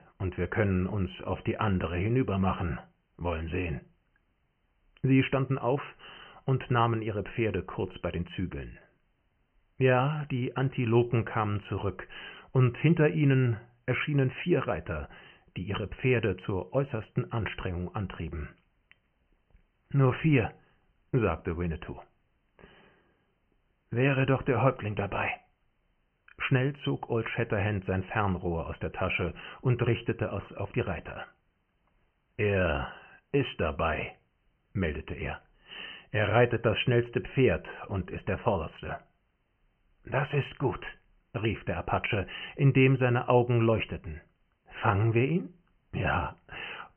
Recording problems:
high frequencies cut off; severe; nothing above 3 kHz

